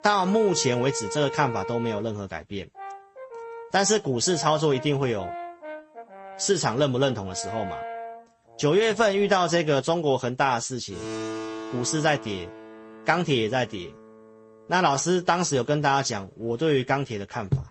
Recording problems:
garbled, watery; slightly; nothing above 8 kHz
background music; noticeable; throughout; 15 dB below the speech

